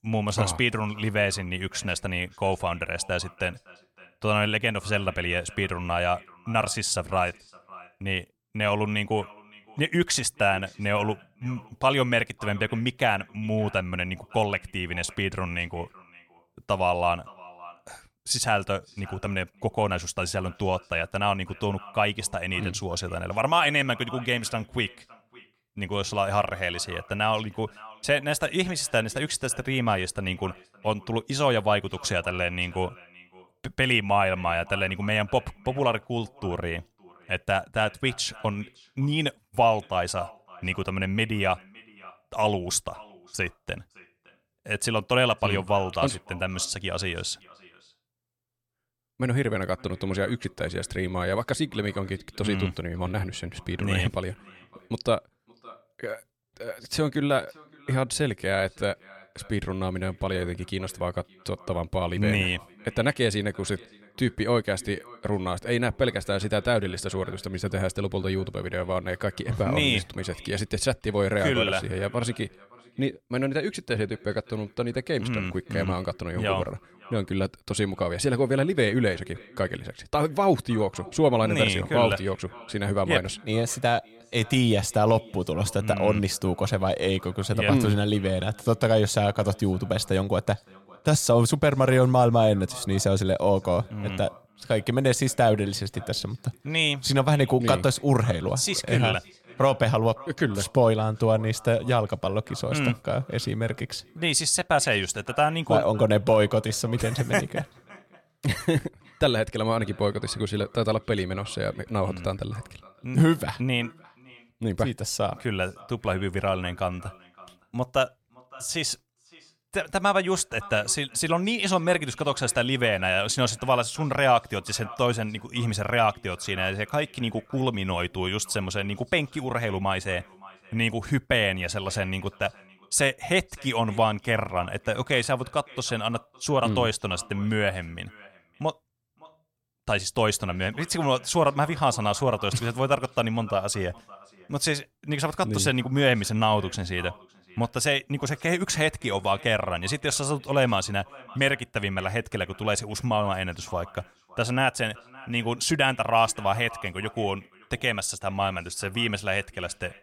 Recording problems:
echo of what is said; faint; throughout; 560 ms later, 25 dB below the speech

